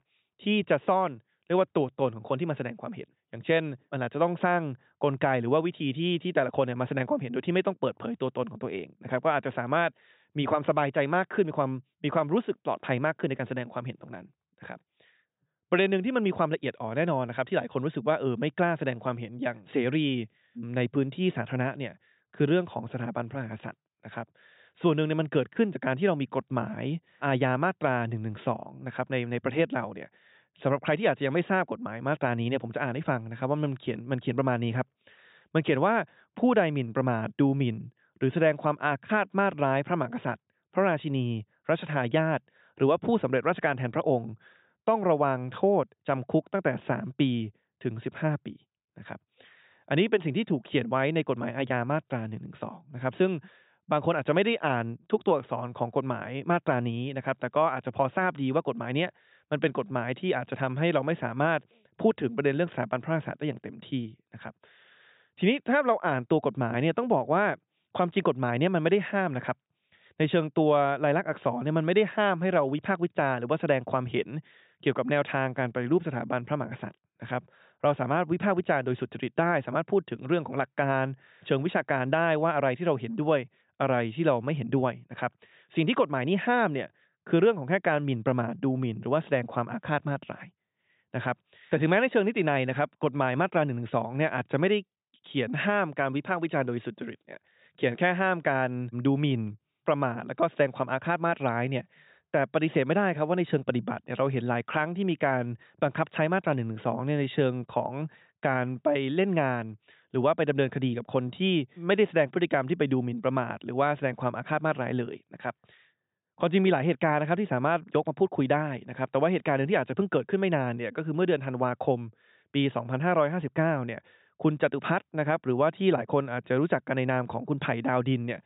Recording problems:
high frequencies cut off; severe; nothing above 4 kHz

